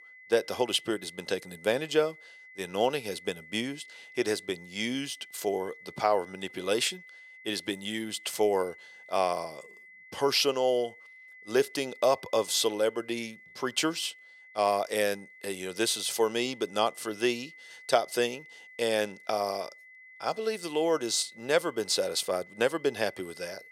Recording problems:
thin; very; fading below 500 Hz
high-pitched whine; noticeable; throughout; 2 kHz, 20 dB below the speech

